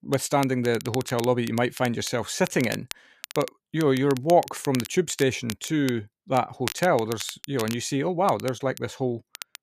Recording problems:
crackle, like an old record; noticeable; 15 dB below the speech

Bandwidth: 14.5 kHz